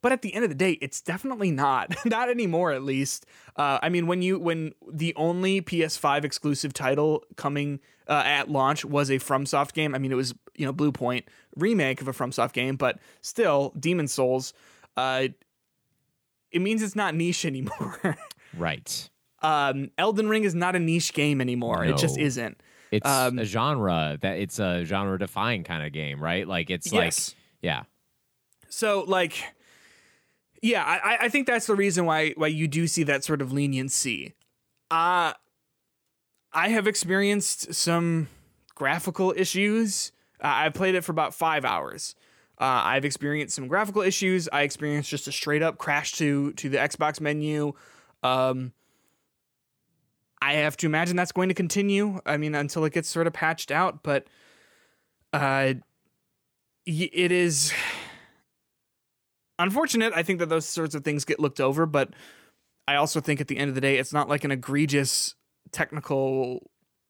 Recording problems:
none

